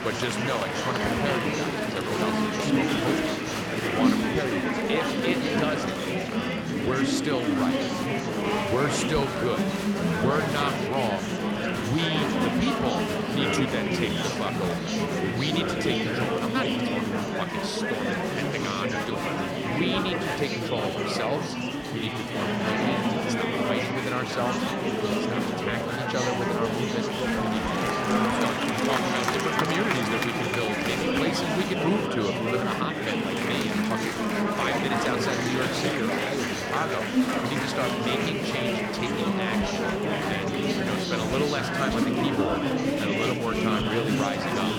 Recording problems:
murmuring crowd; very loud; throughout; 5 dB above the speech

